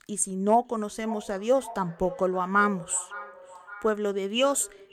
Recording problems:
echo of what is said; noticeable; throughout; 560 ms later, 15 dB below the speech

